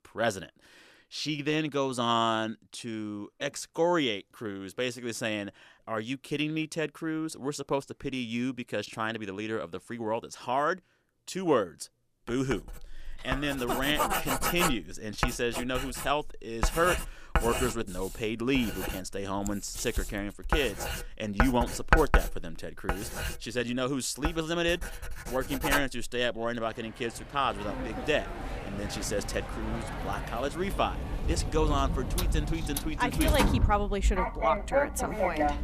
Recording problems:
household noises; loud; from 13 s on; 2 dB below the speech

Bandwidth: 14.5 kHz